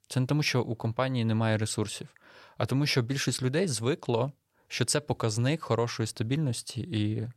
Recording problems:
none

